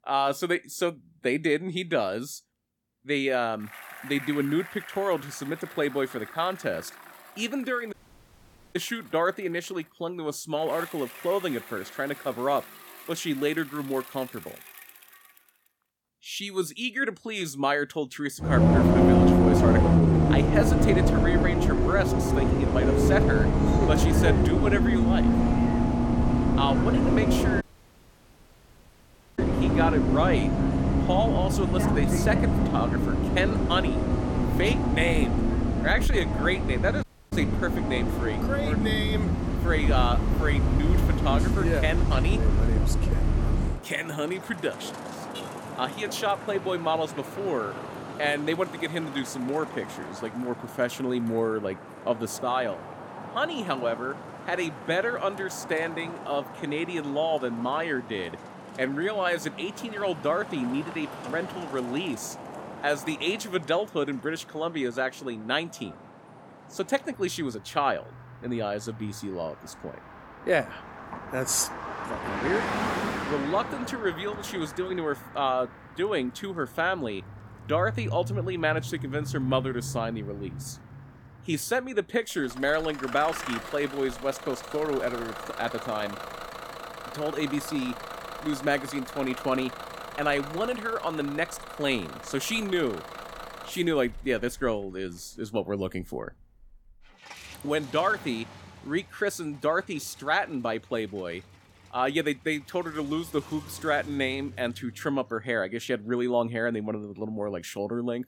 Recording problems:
traffic noise; very loud; throughout; 3 dB above the speech
audio cutting out; at 8 s for 1 s, at 28 s for 2 s and at 37 s

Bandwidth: 17.5 kHz